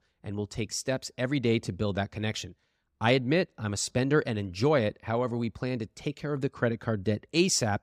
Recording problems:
none

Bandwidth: 15.5 kHz